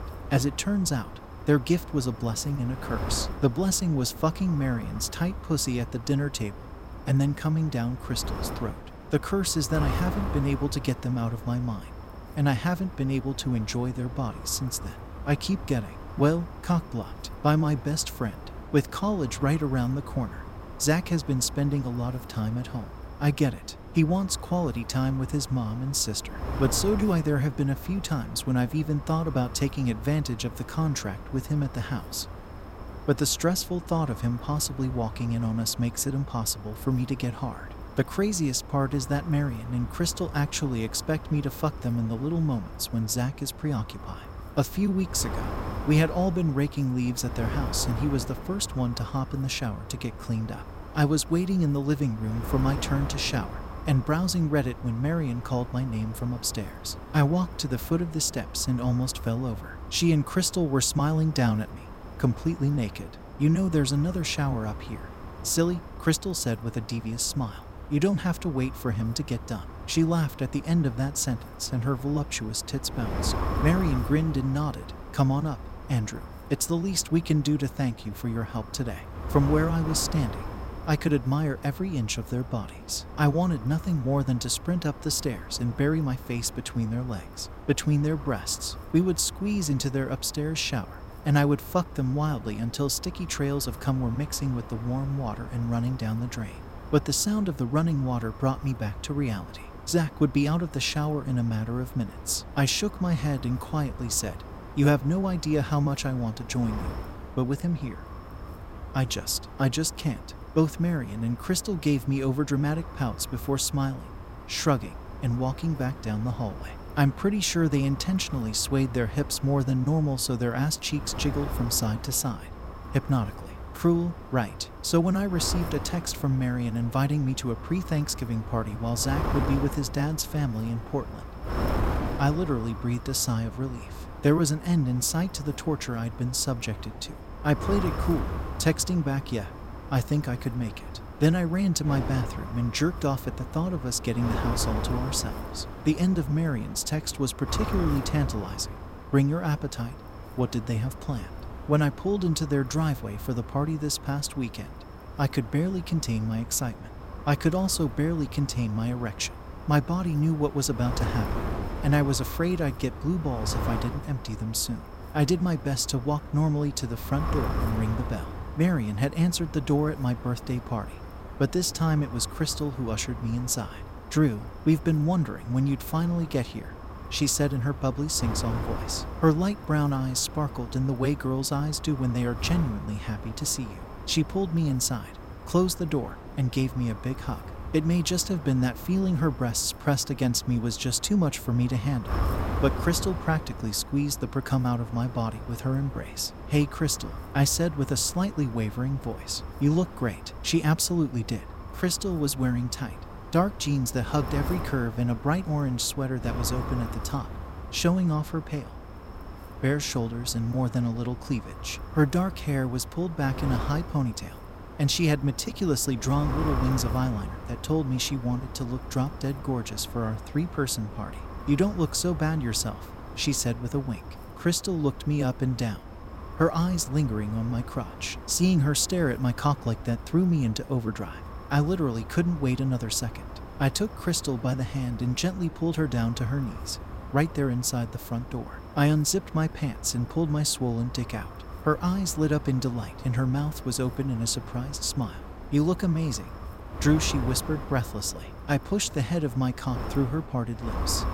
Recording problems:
wind noise on the microphone; occasional gusts; 10 dB below the speech

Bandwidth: 16 kHz